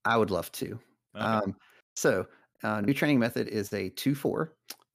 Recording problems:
choppy; occasionally; at 3 s; 2% of the speech affected

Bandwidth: 15 kHz